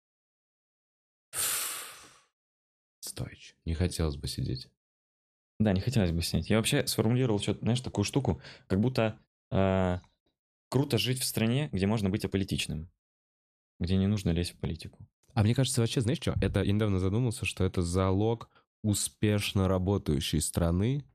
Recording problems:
uneven, jittery; strongly; from 1.5 to 20 s

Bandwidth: 14 kHz